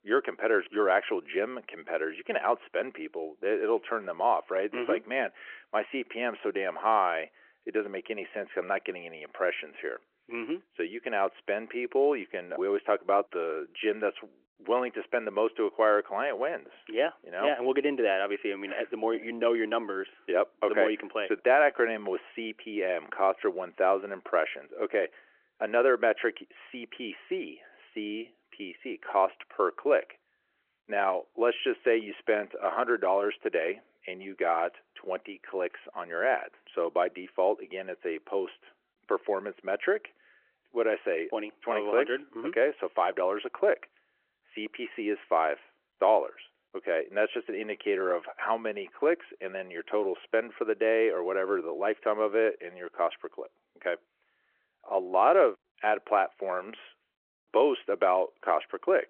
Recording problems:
phone-call audio

